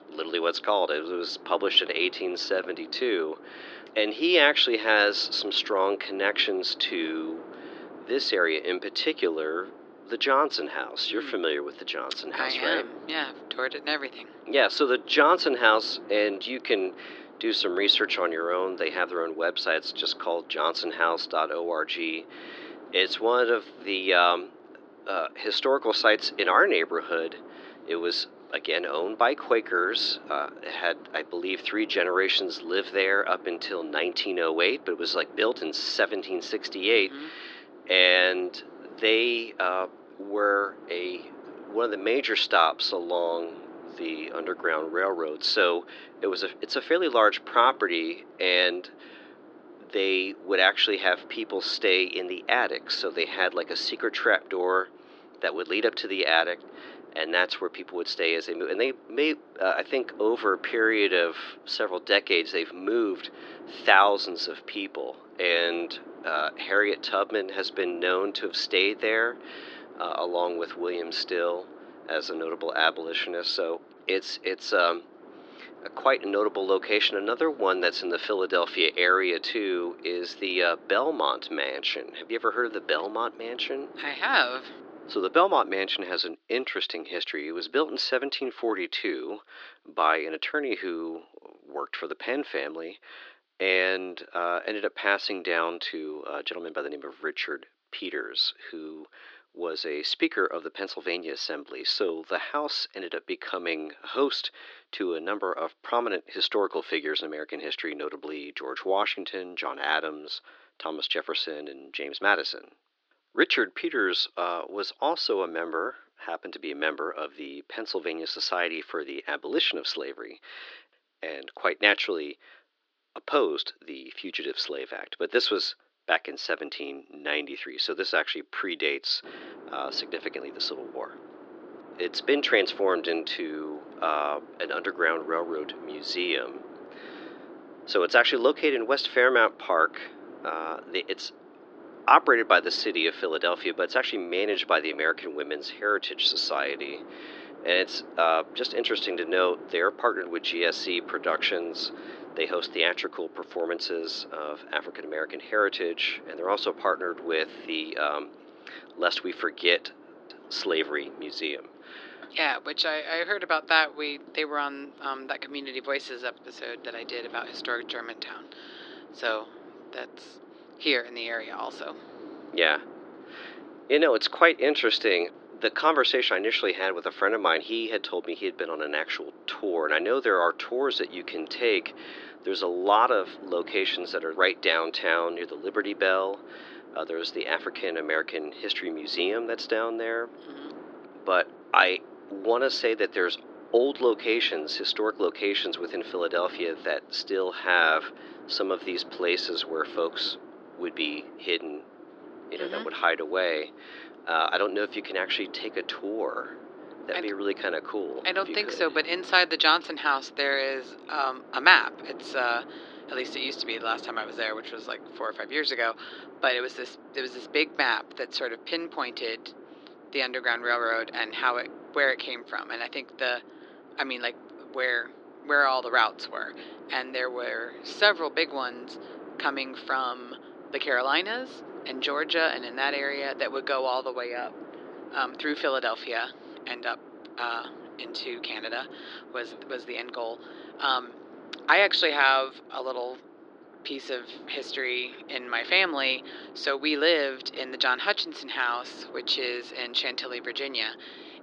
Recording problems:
thin; very; fading below 300 Hz
muffled; very slightly; fading above 4.5 kHz
wind noise on the microphone; occasional gusts; until 1:26 and from 2:09 on; 20 dB below the speech

